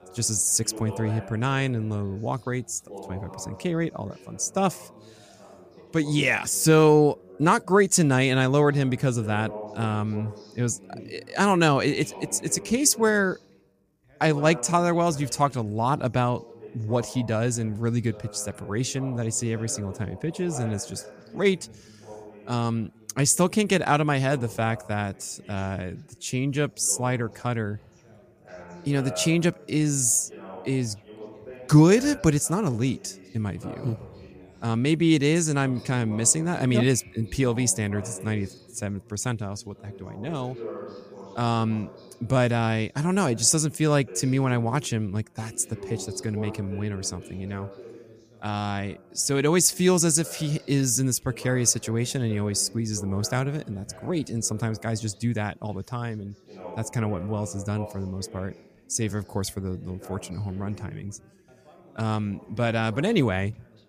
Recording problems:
background chatter; noticeable; throughout; 3 voices, 20 dB below the speech

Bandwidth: 15 kHz